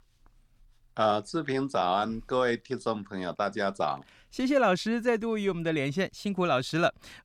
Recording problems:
none

